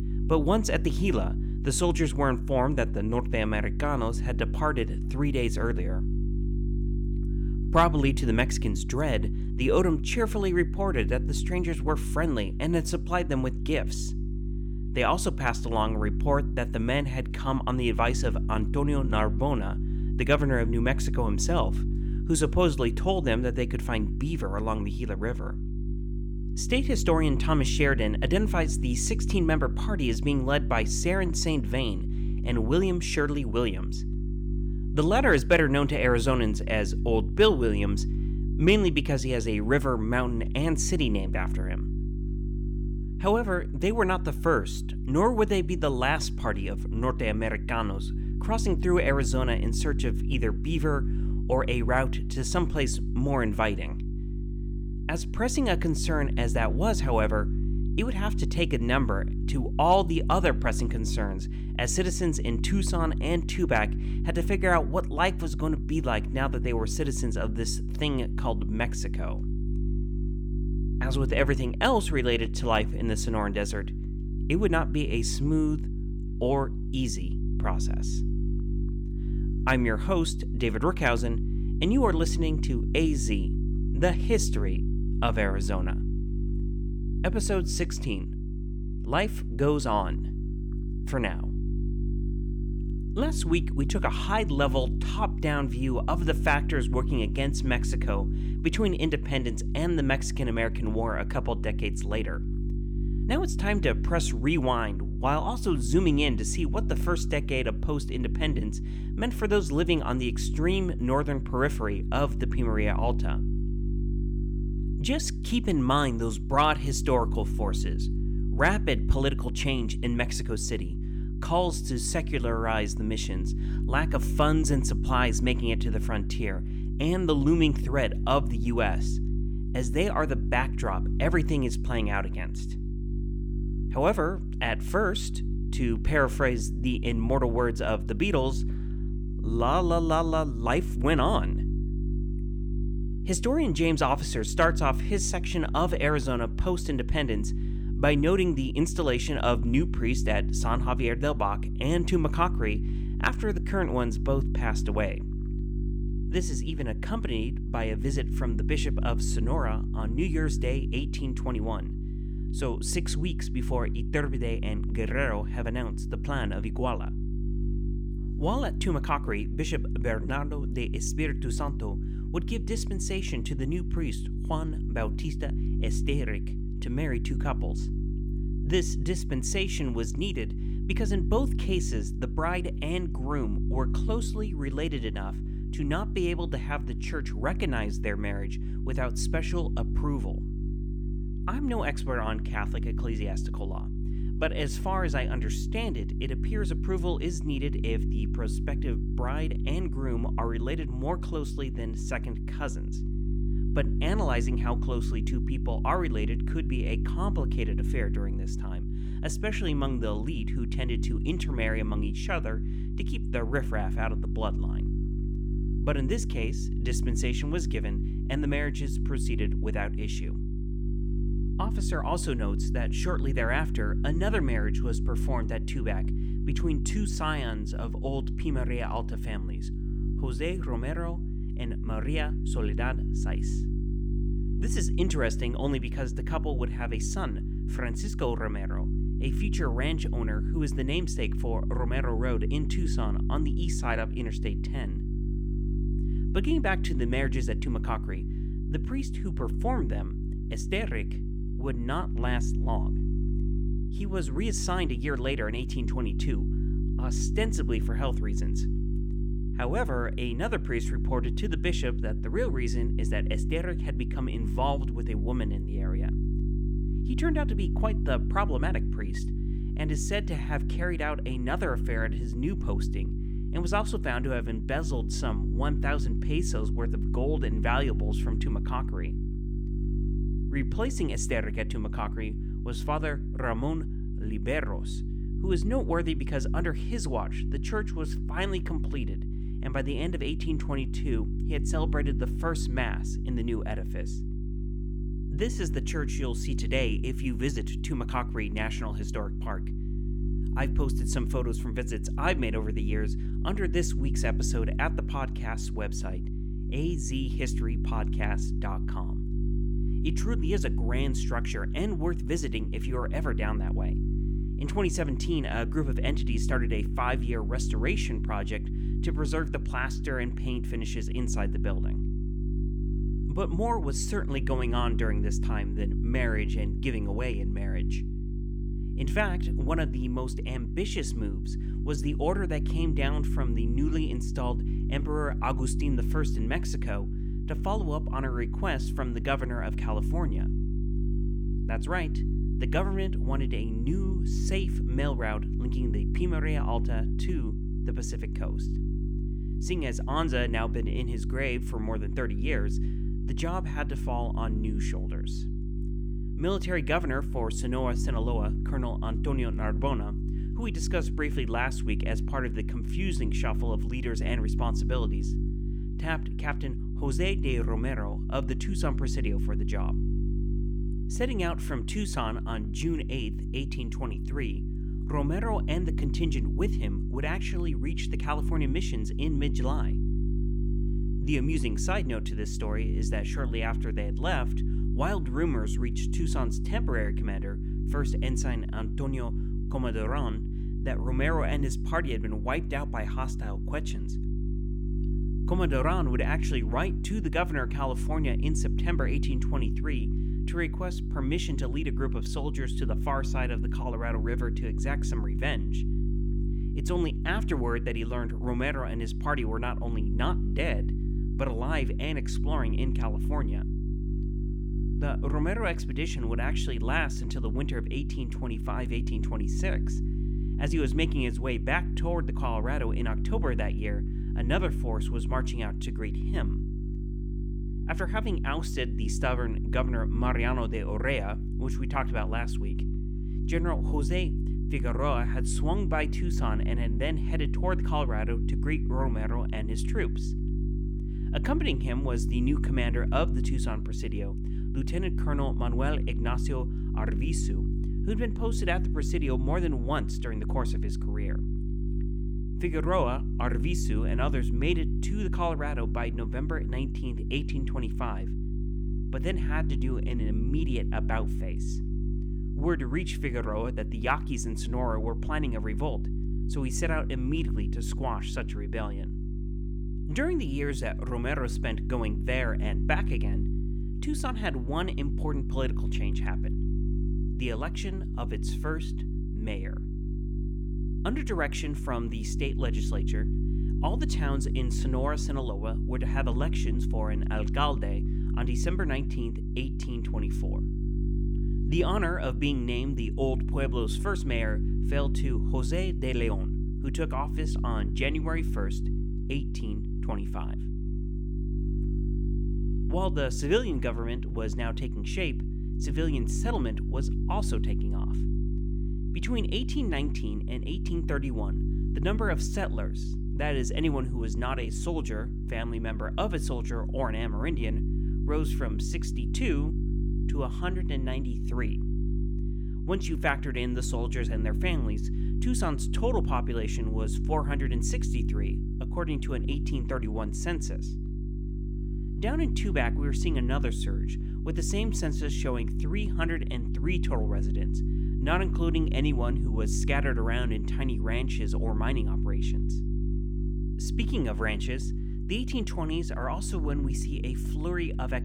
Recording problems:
electrical hum; noticeable; throughout; 50 Hz, 10 dB below the speech

